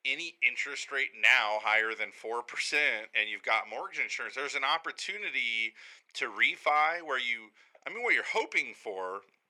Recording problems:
thin; very; fading below 500 Hz

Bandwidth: 18.5 kHz